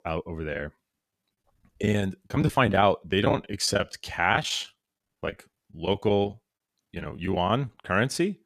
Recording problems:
choppy; very; 11% of the speech affected

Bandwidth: 14.5 kHz